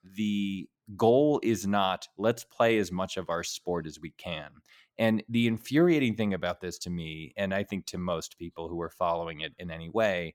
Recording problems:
none

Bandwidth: 17 kHz